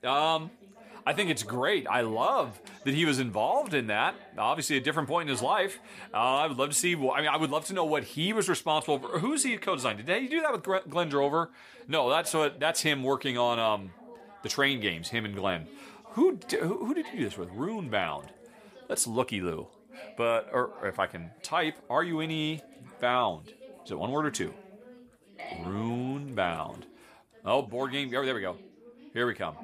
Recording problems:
background chatter; faint; throughout; 3 voices, 20 dB below the speech

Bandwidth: 14.5 kHz